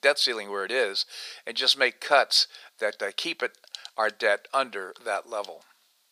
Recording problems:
thin; very; fading below 600 Hz

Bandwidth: 15 kHz